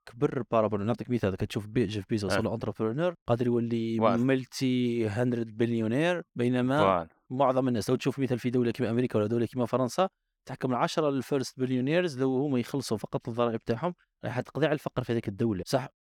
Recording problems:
none

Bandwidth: 18 kHz